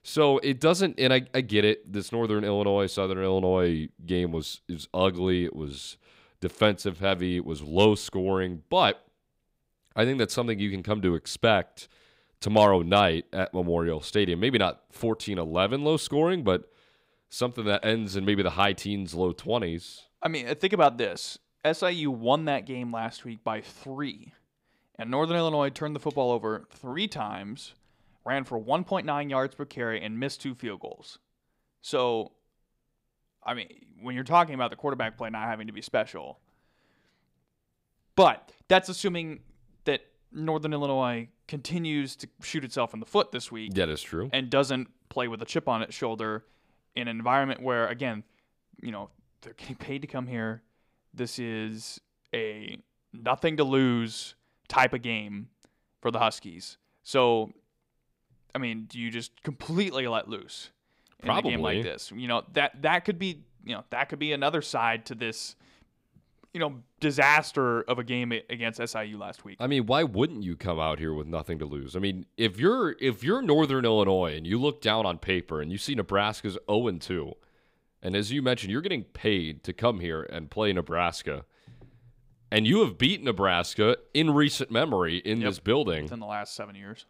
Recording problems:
none

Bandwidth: 15.5 kHz